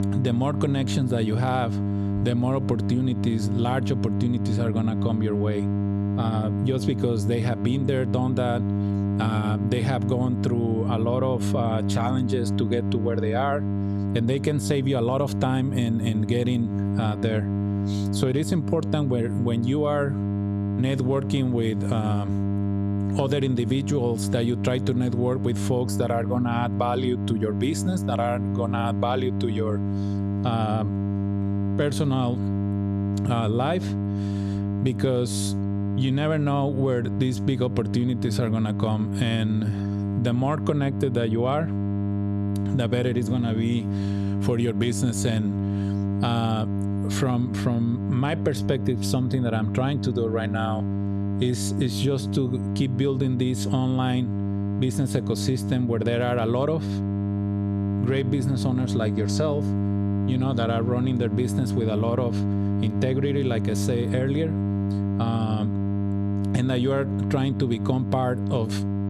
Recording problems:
squashed, flat; somewhat
electrical hum; loud; throughout; 50 Hz, 7 dB below the speech

